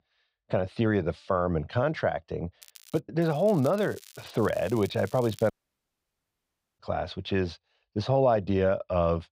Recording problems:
muffled; very slightly; fading above 3.5 kHz
crackling; faint; at 2.5 s and from 3 to 5.5 s; 20 dB below the speech
audio cutting out; at 5.5 s for 1.5 s

